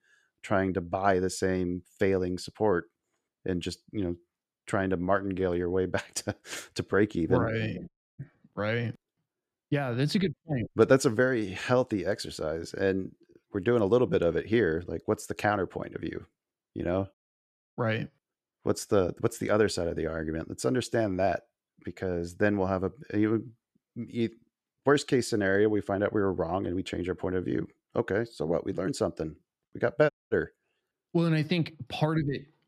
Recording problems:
audio cutting out; at 8 s and at 30 s

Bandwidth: 14.5 kHz